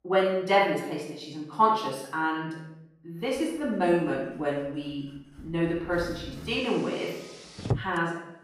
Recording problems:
off-mic speech; far
room echo; noticeable; dies away in 0.7 s
traffic noise; noticeable; throughout; 10 dB below the speech

